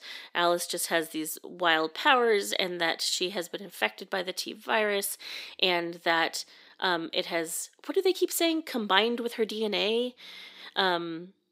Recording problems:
thin; somewhat; fading below 300 Hz

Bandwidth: 15.5 kHz